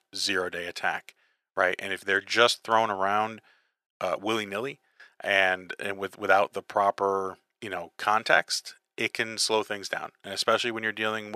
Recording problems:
thin; very; fading below 400 Hz
abrupt cut into speech; at the end

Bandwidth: 14 kHz